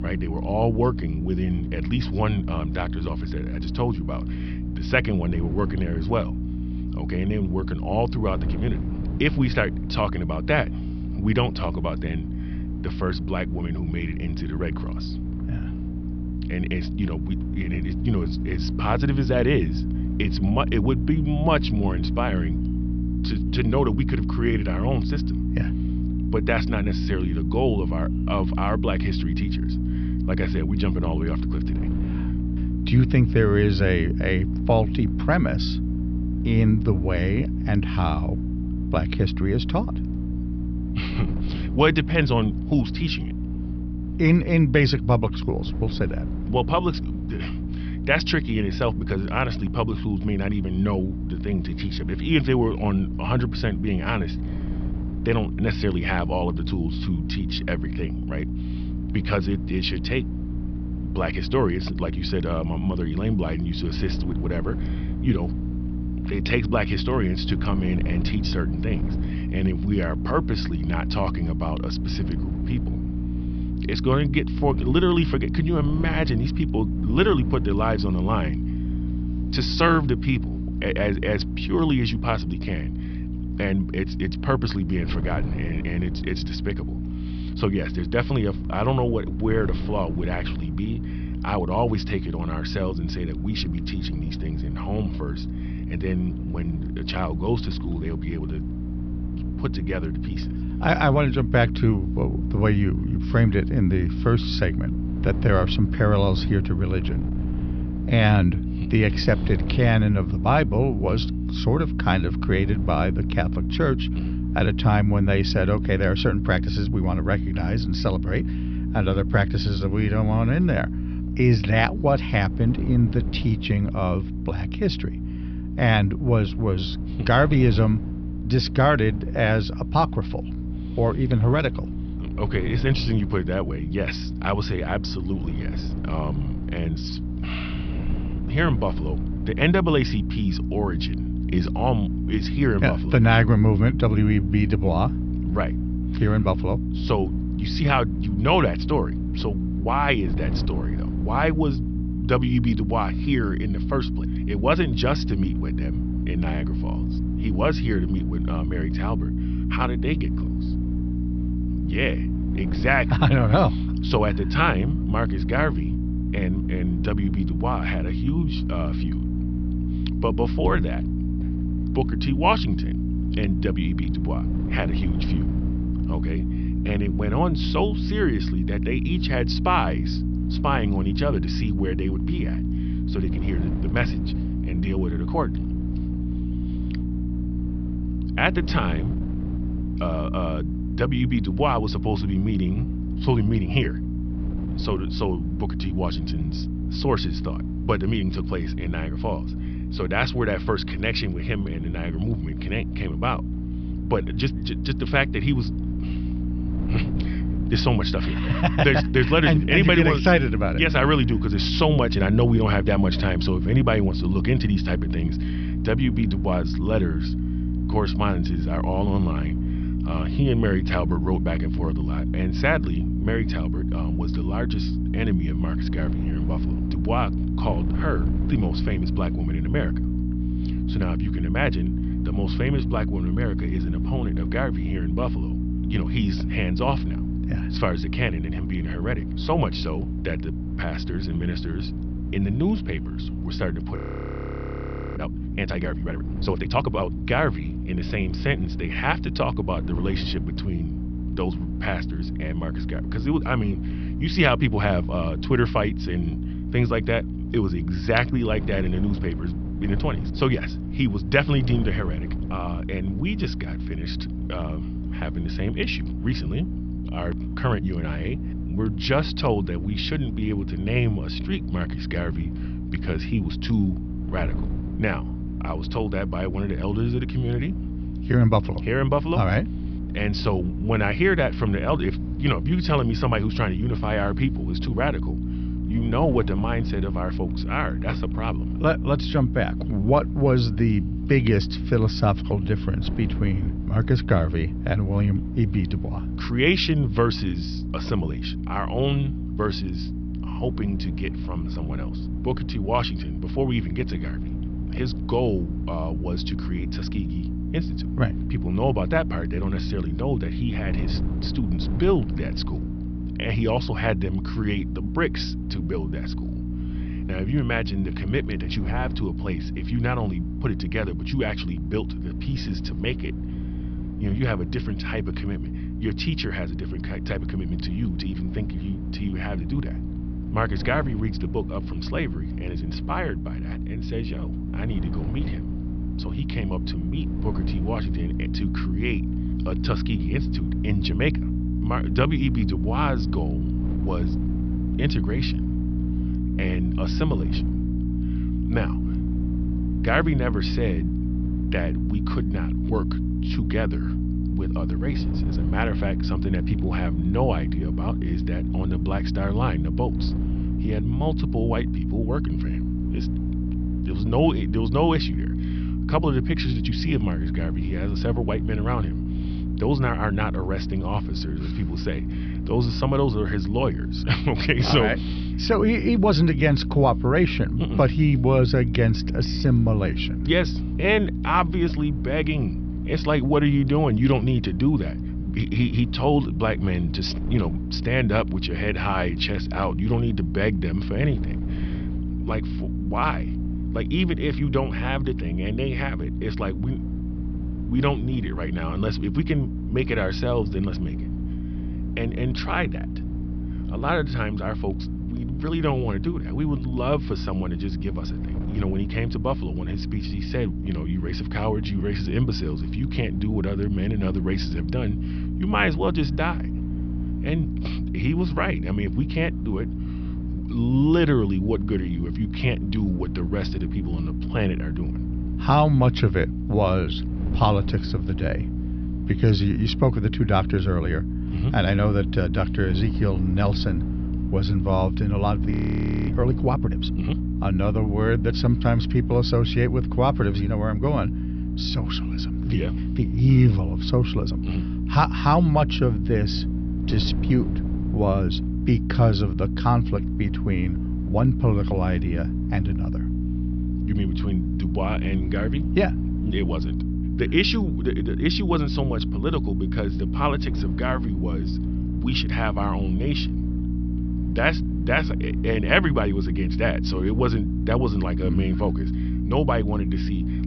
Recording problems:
high frequencies cut off; noticeable; nothing above 5.5 kHz
electrical hum; loud; throughout; 60 Hz, 10 dB below the speech
wind noise on the microphone; occasional gusts; 20 dB below the speech
audio freezing; at 4:04 for 1 s and at 7:16 for 0.5 s

